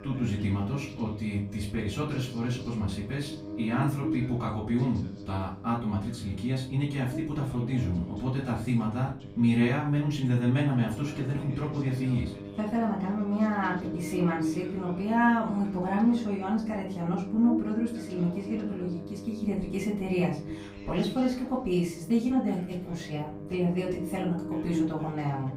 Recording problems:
off-mic speech; far
room echo; slight; dies away in 0.4 s
electrical hum; loud; throughout; 50 Hz, 10 dB below the speech
voice in the background; faint; throughout; 25 dB below the speech

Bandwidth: 15.5 kHz